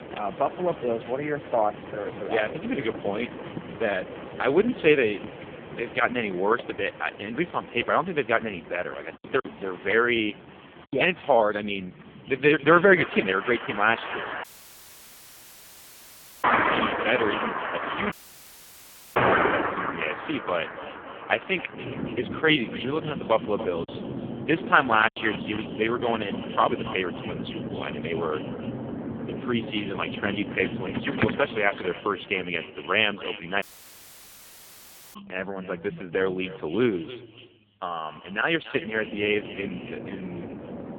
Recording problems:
phone-call audio; poor line; nothing above 3.5 kHz
echo of what is said; noticeable; from 12 s on; 280 ms later, 15 dB below the speech
traffic noise; loud; throughout; 6 dB below the speech
choppy; very; from 9 to 11 s and from 24 to 25 s; 9% of the speech affected
audio cutting out; at 14 s for 2 s, at 18 s for 1 s and at 34 s for 1.5 s

